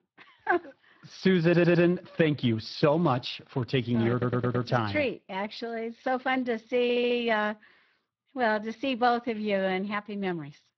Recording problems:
garbled, watery; slightly
audio stuttering; at 1.5 s, at 4 s and at 7 s

